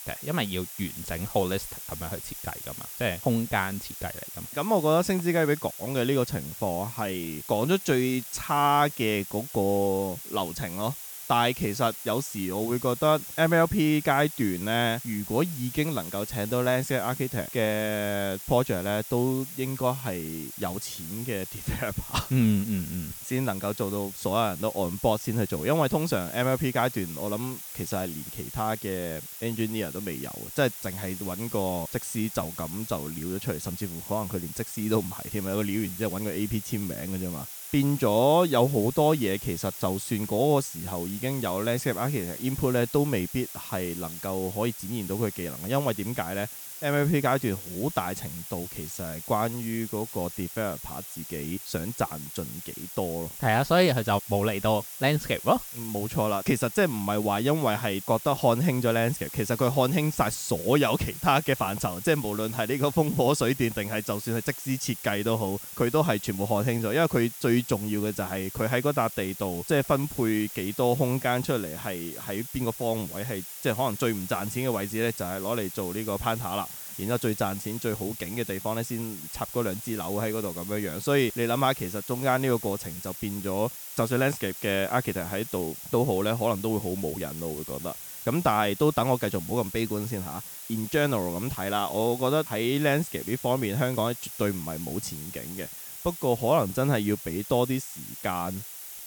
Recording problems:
hiss; loud; throughout; 9 dB below the speech

